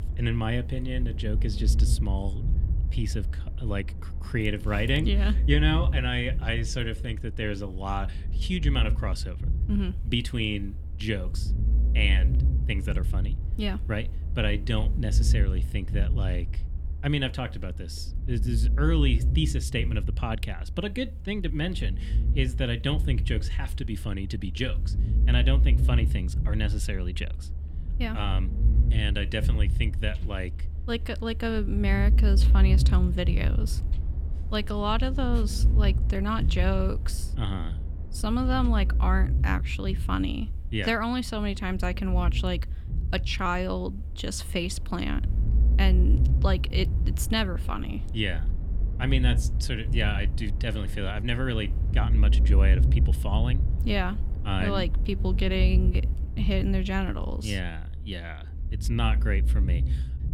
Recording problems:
low rumble; noticeable; throughout; 15 dB below the speech

